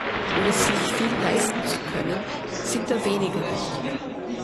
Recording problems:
garbled, watery; slightly; nothing above 11.5 kHz
murmuring crowd; loud; throughout; 1 dB below the speech

